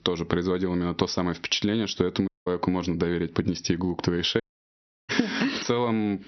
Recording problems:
high frequencies cut off; noticeable; nothing above 6 kHz
squashed, flat; somewhat
audio cutting out; at 2.5 s and at 4.5 s for 0.5 s

